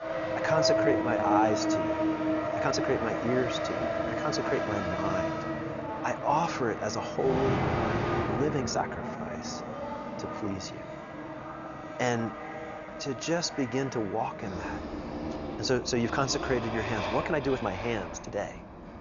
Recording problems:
high frequencies cut off; noticeable; nothing above 7 kHz
traffic noise; loud; throughout; 1 dB below the speech
uneven, jittery; strongly; from 0.5 to 18 s

